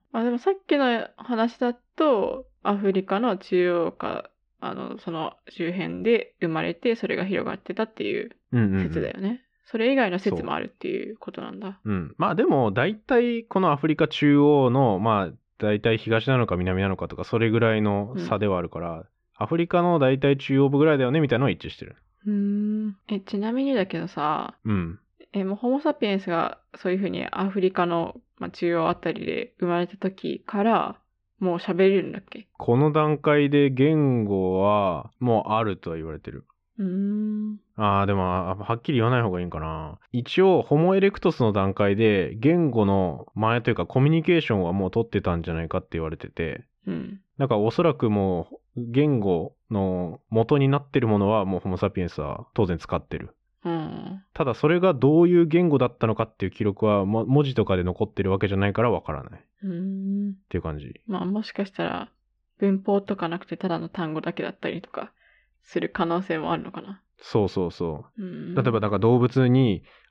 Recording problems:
muffled; very; fading above 3 kHz

